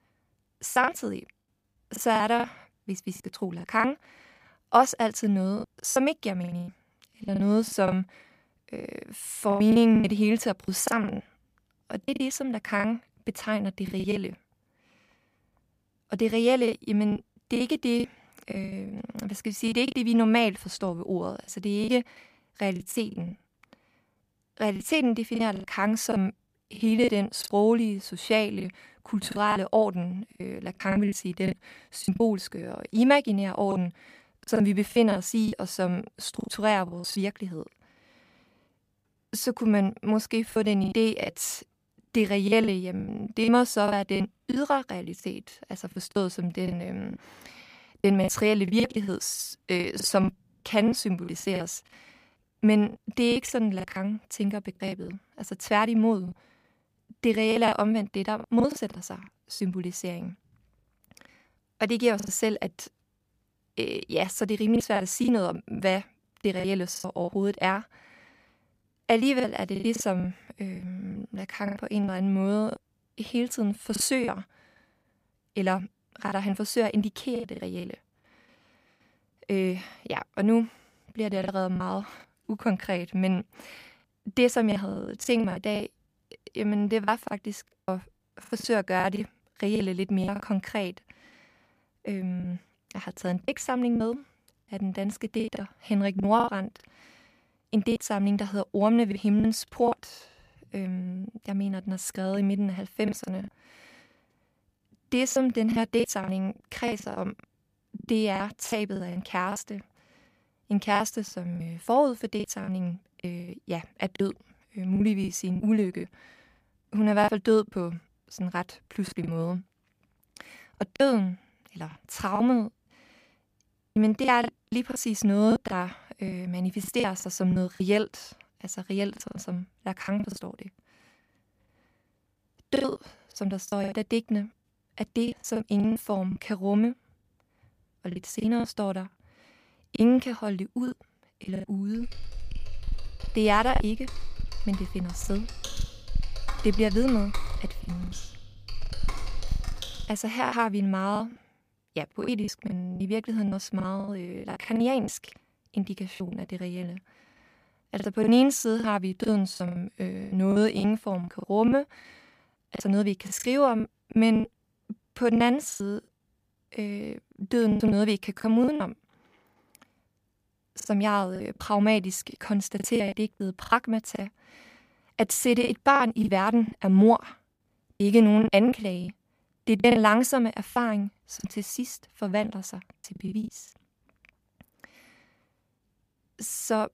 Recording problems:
choppy; very; 11% of the speech affected
keyboard typing; noticeable; from 2:22 to 2:30; peak 7 dB below the speech

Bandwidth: 15 kHz